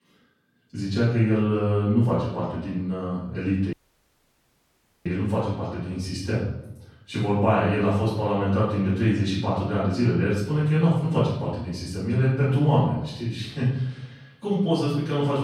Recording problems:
off-mic speech; far
room echo; noticeable; dies away in 0.7 s
audio cutting out; at 3.5 s for 1.5 s

